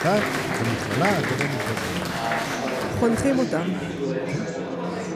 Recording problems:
chatter from many people; very loud; throughout; as loud as the speech

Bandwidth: 15 kHz